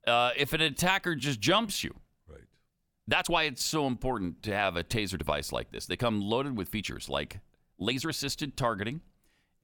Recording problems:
uneven, jittery; strongly; from 0.5 to 8.5 s

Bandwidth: 18 kHz